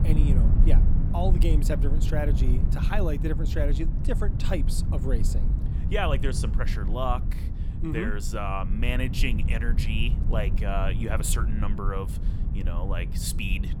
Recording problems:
low rumble; loud; throughout; 9 dB below the speech

